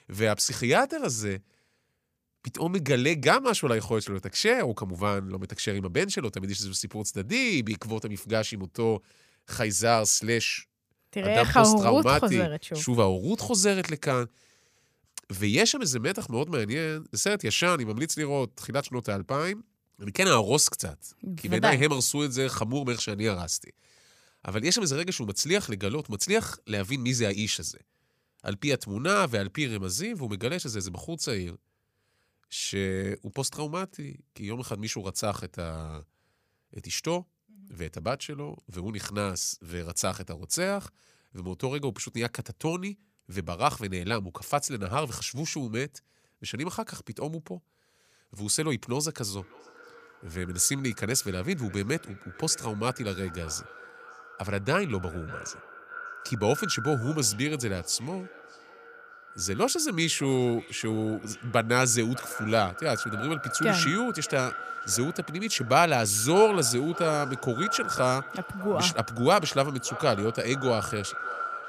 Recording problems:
echo of what is said; strong; from 49 s on; 600 ms later, 10 dB below the speech

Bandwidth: 15 kHz